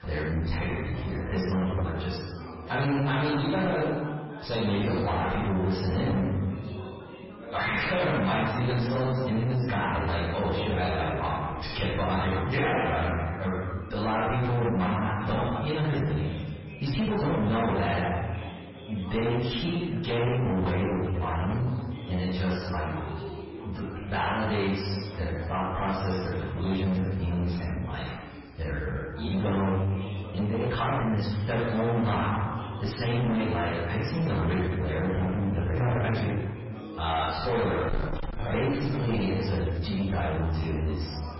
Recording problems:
distortion; heavy; 5 dB below the speech
off-mic speech; far
garbled, watery; badly; nothing above 5.5 kHz
room echo; noticeable; dies away in 1 s
chatter from many people; noticeable; throughout; 15 dB below the speech
uneven, jittery; strongly; from 17 to 37 s

